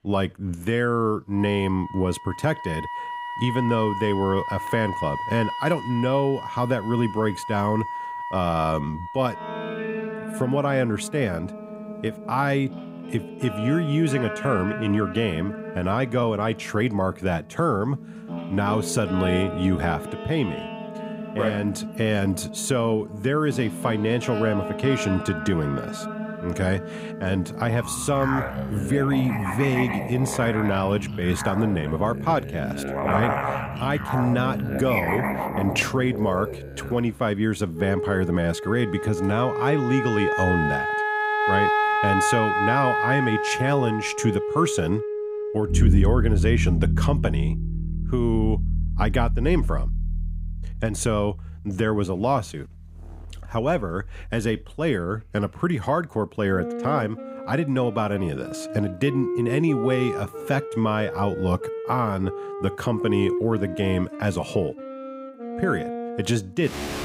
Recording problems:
background music; loud; throughout; 4 dB below the speech

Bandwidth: 15.5 kHz